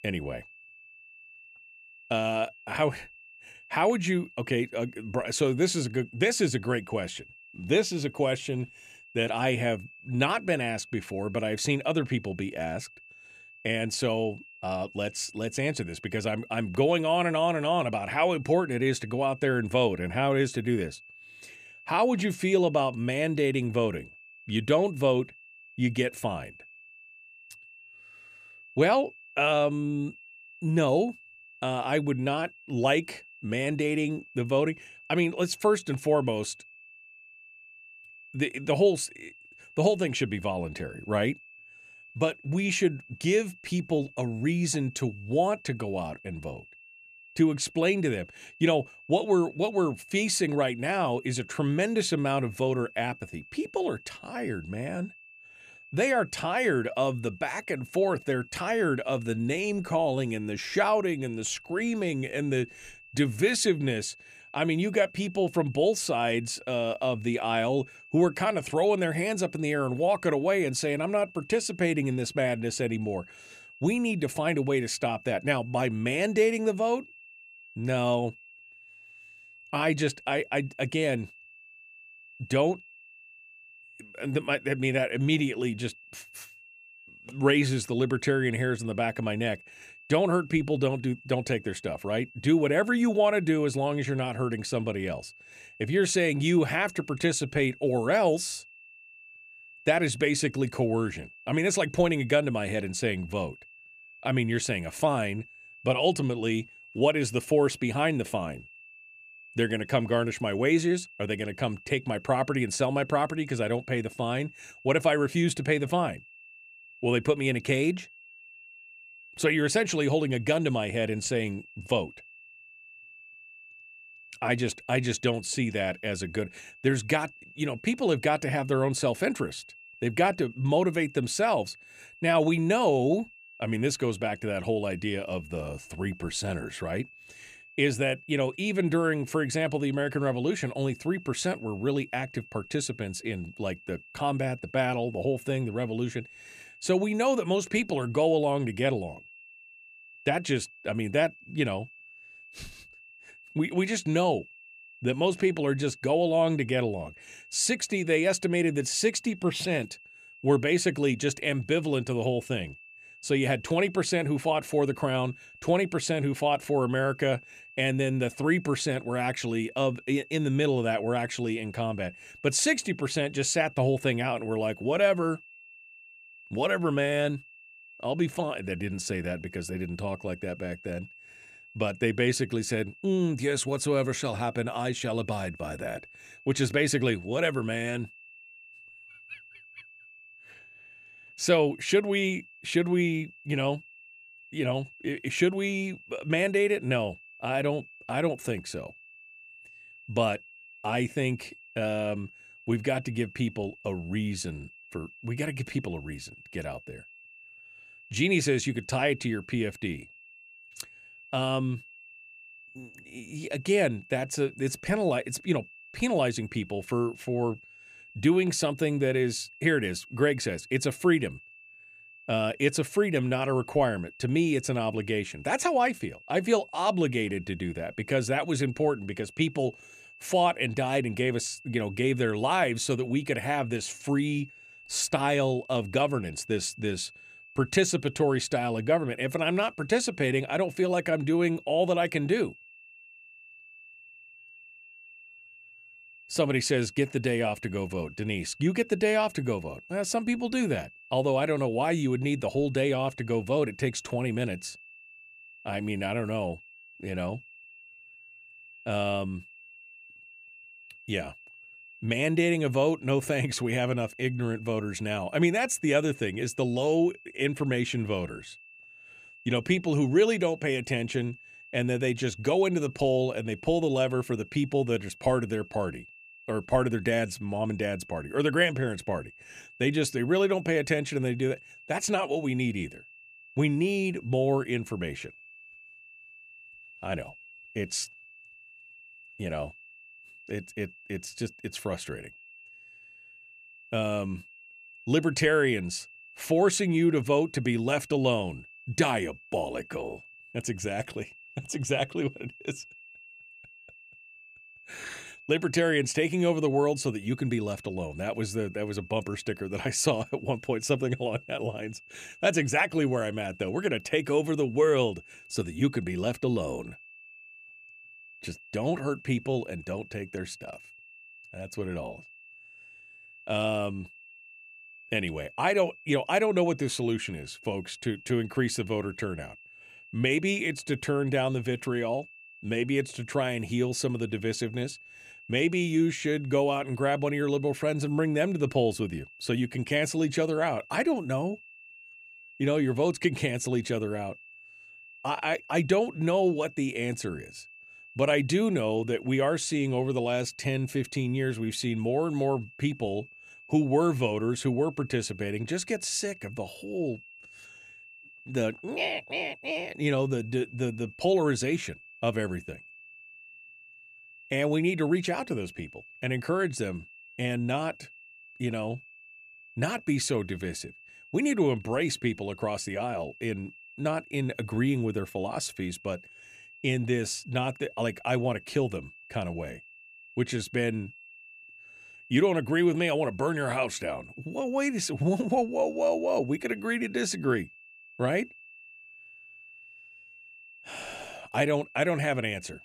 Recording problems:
high-pitched whine; faint; throughout; 2.5 kHz, 20 dB below the speech

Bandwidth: 14.5 kHz